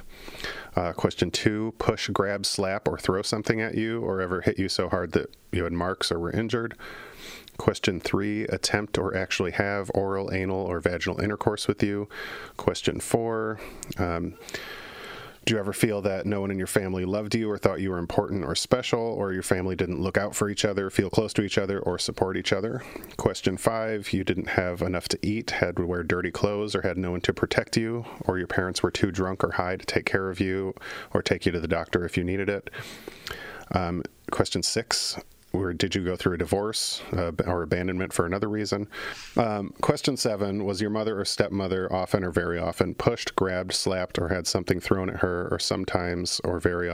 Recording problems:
squashed, flat; somewhat
abrupt cut into speech; at the end

